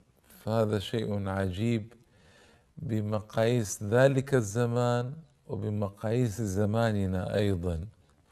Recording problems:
wrong speed, natural pitch; too slow; 0.6 times normal speed

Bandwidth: 13.5 kHz